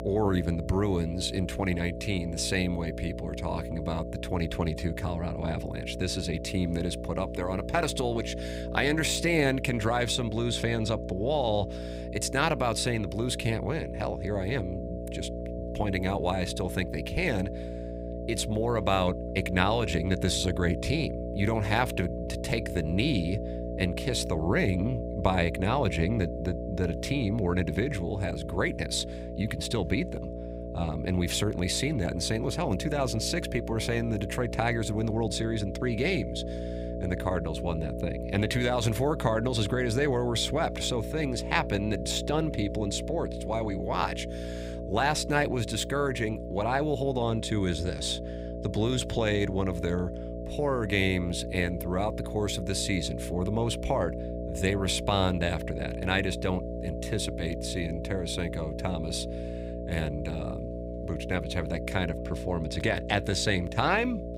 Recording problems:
electrical hum; loud; throughout; 60 Hz, 8 dB below the speech

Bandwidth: 15.5 kHz